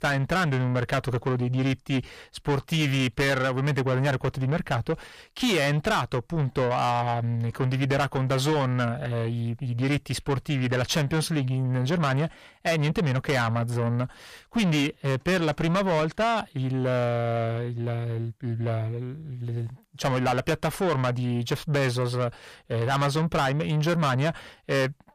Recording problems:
distortion; heavy; 7 dB below the speech

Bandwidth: 14.5 kHz